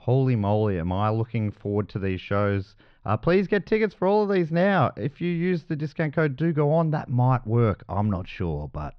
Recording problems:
muffled; very slightly; fading above 4 kHz

